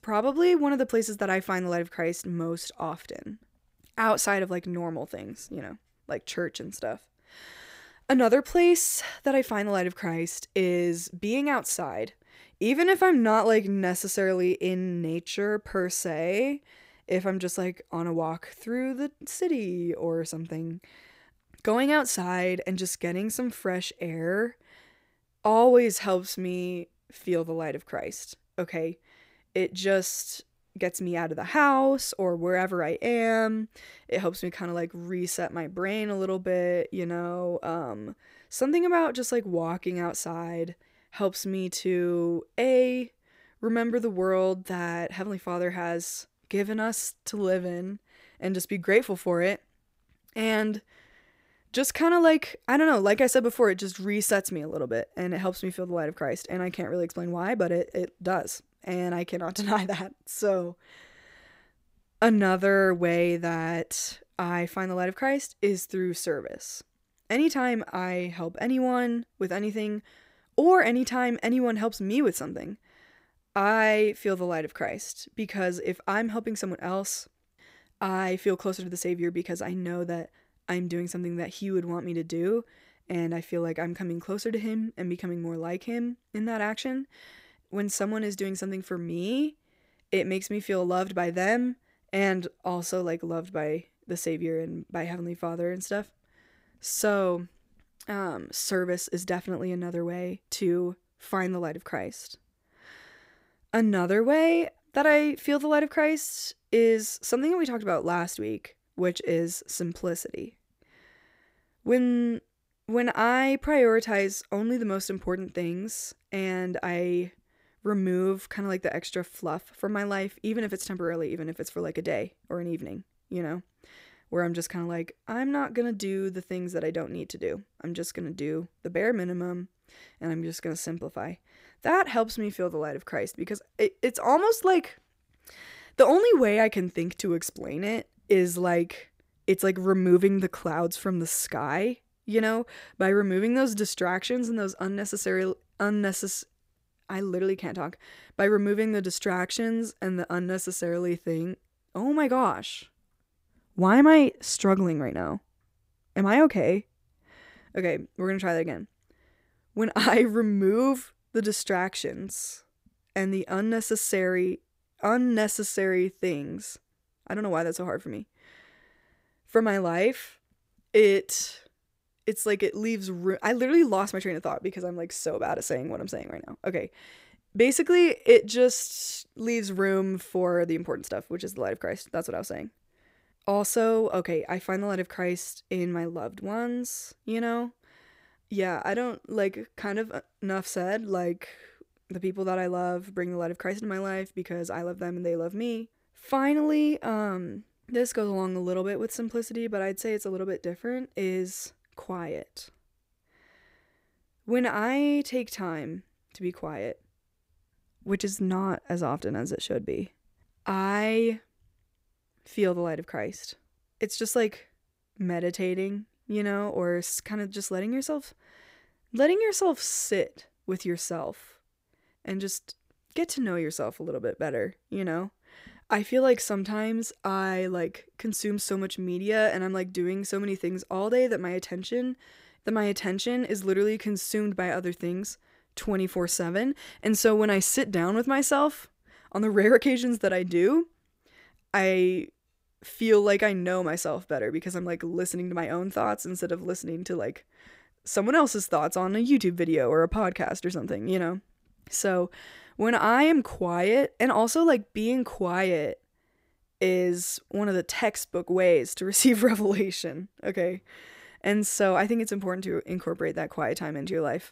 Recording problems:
none

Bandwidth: 15.5 kHz